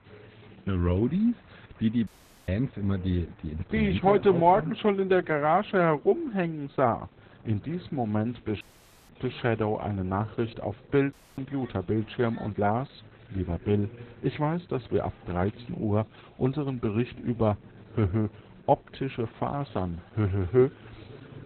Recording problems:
garbled, watery; badly; nothing above 4 kHz
murmuring crowd; faint; throughout; 20 dB below the speech
audio cutting out; at 2 s, at 8.5 s and at 11 s

